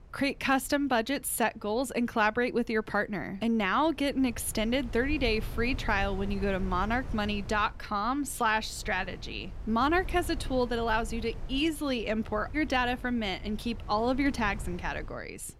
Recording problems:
wind noise on the microphone; occasional gusts; 20 dB below the speech

